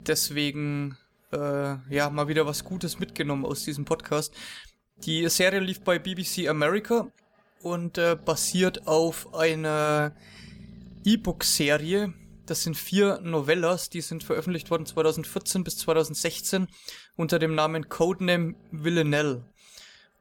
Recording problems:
animal sounds; faint; throughout; 25 dB below the speech

